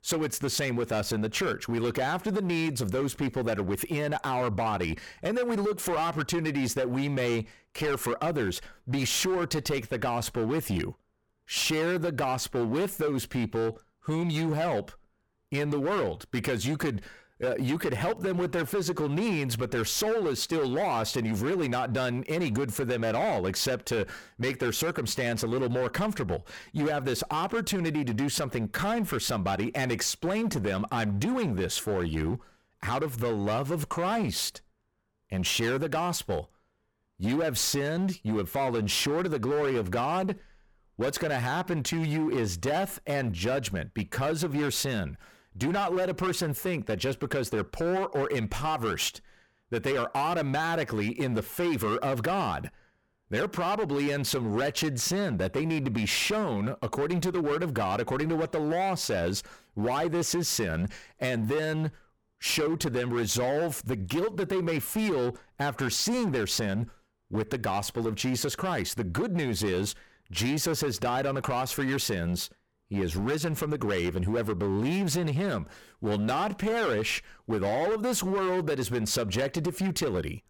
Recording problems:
distortion; slight; 17% of the sound clipped

